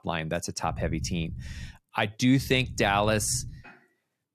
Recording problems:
low rumble; faint; at 0.5 s and from 2.5 to 3.5 s; 25 dB below the speech

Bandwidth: 14 kHz